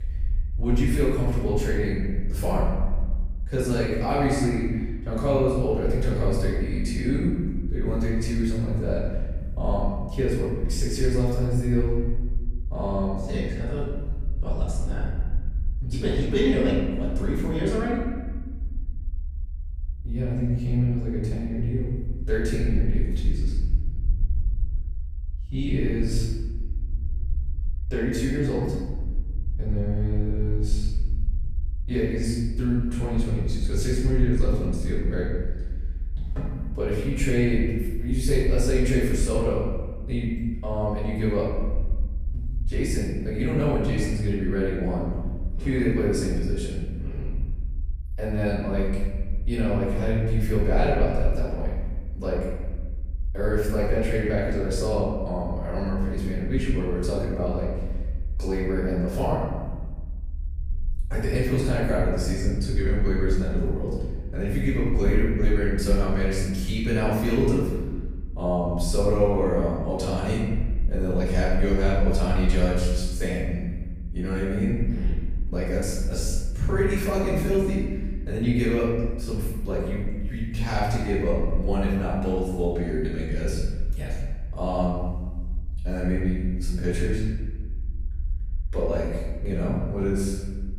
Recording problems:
off-mic speech; far
room echo; noticeable; dies away in 1.2 s
low rumble; faint; throughout; 25 dB below the speech

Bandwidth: 15 kHz